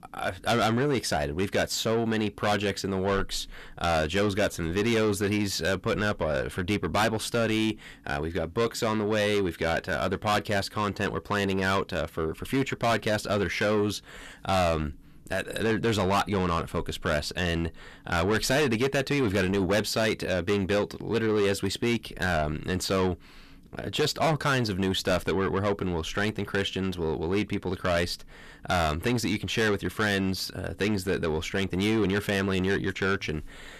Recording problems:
distortion; heavy; 6 dB below the speech

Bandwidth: 14.5 kHz